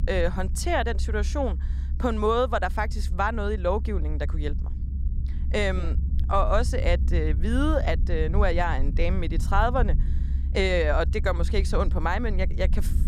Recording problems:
low rumble; noticeable; throughout; 20 dB below the speech

